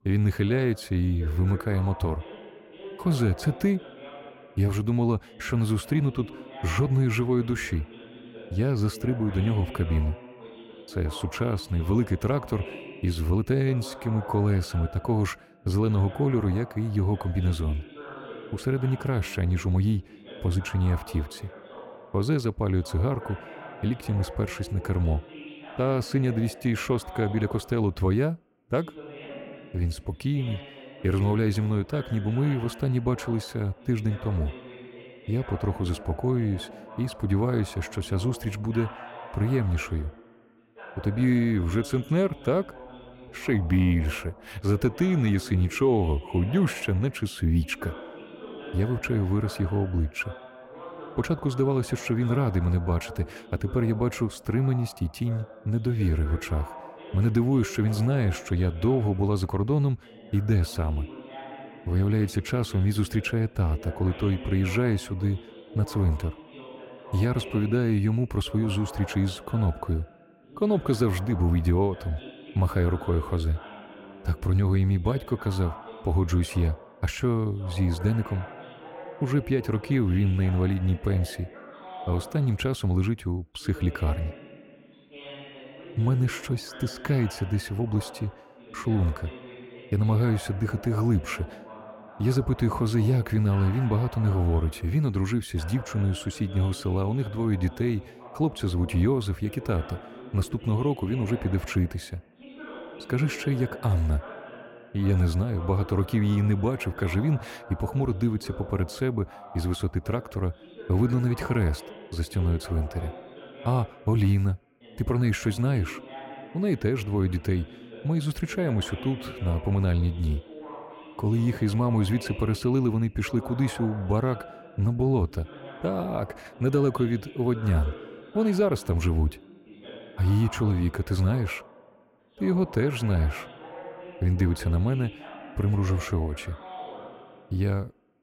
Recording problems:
voice in the background; noticeable; throughout; 15 dB below the speech

